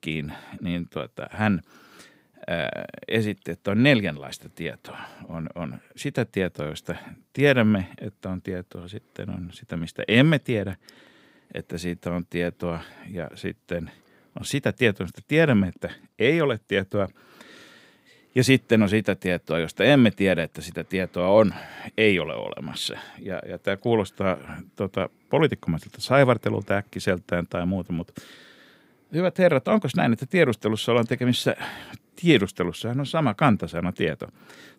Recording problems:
none

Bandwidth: 15.5 kHz